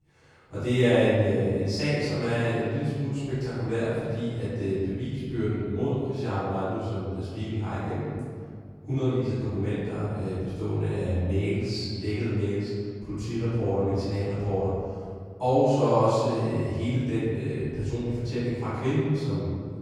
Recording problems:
room echo; strong; dies away in 2 s
off-mic speech; far

